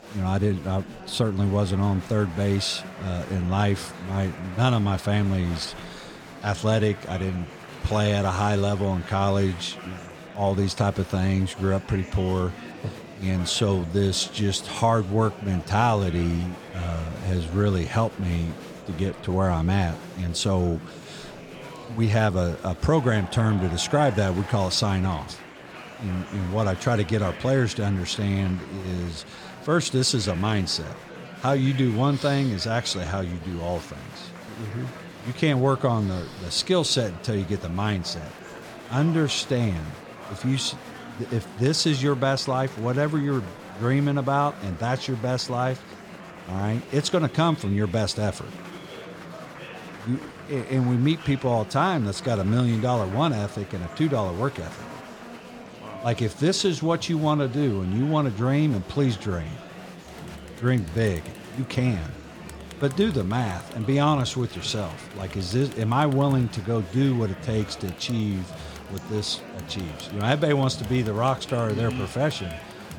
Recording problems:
murmuring crowd; noticeable; throughout; 15 dB below the speech

